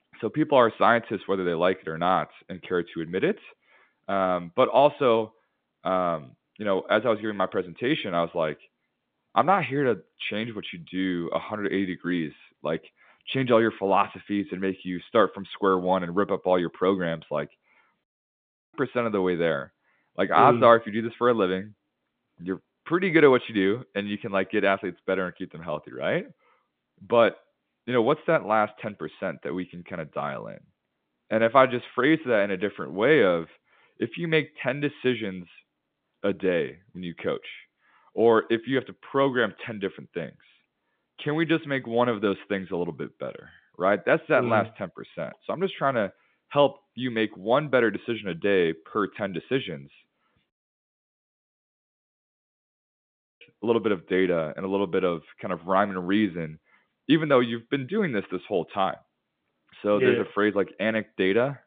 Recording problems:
phone-call audio; nothing above 3.5 kHz
audio cutting out; at 18 s for 0.5 s and at 51 s for 3 s

